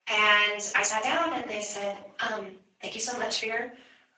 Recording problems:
off-mic speech; far
room echo; noticeable; dies away in 0.5 s
thin; somewhat; fading below 650 Hz
garbled, watery; slightly; nothing above 7.5 kHz
uneven, jittery; strongly

